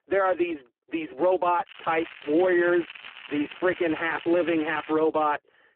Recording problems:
phone-call audio; poor line
crackling; noticeable; from 1.5 to 5 s; 15 dB below the speech

